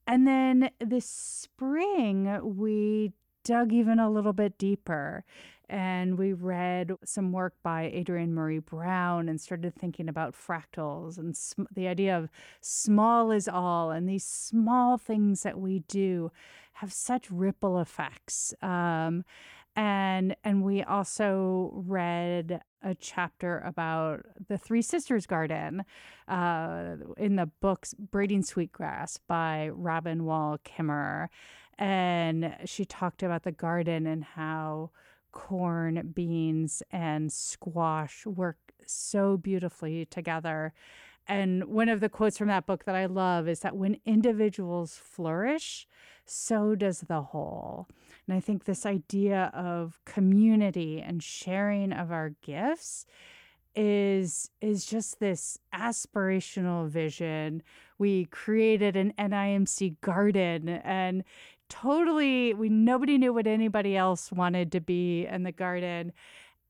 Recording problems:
none

